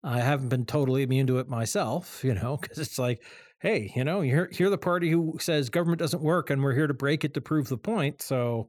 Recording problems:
none

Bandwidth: 18 kHz